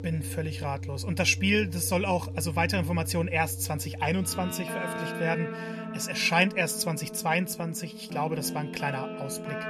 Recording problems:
background music; loud; throughout; 8 dB below the speech

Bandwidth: 14 kHz